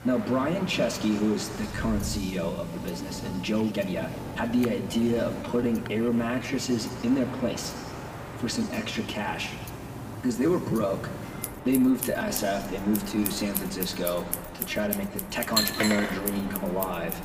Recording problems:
off-mic speech; far
room echo; slight; dies away in 1.6 s
household noises; loud; throughout; 8 dB below the speech
train or aircraft noise; noticeable; throughout; 10 dB below the speech
uneven, jittery; strongly; from 1.5 to 16 s

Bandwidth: 15 kHz